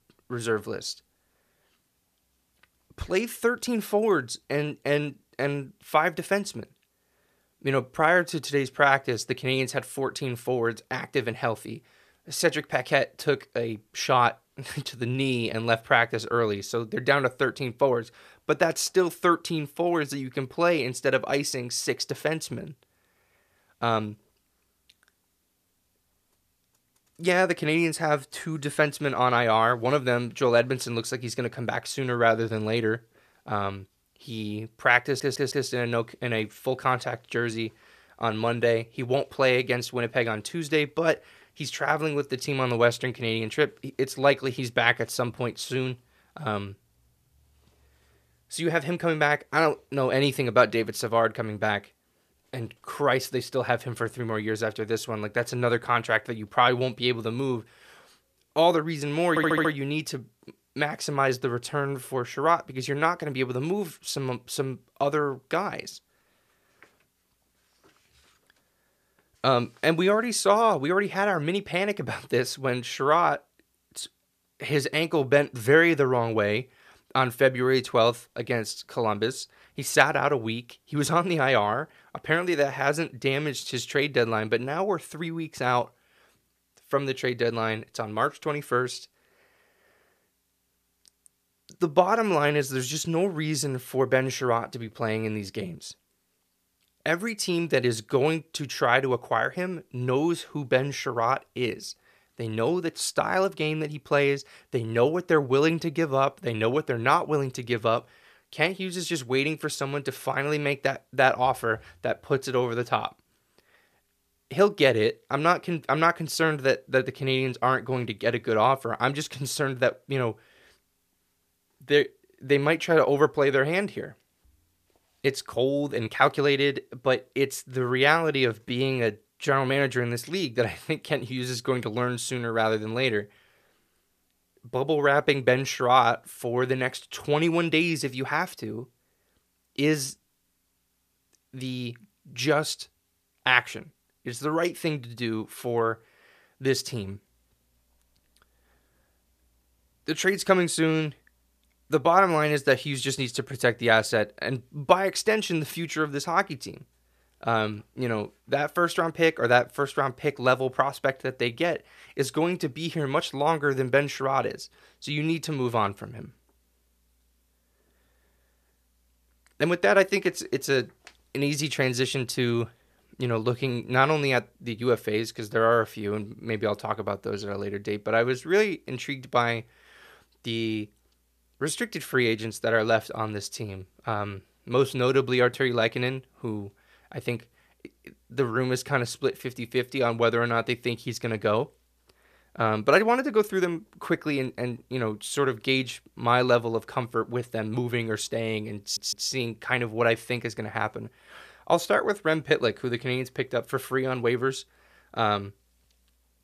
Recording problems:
audio stuttering; at 35 s, at 59 s and at 3:19

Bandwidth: 14.5 kHz